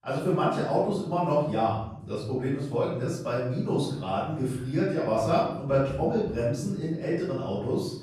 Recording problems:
off-mic speech; far
room echo; noticeable; dies away in 0.8 s

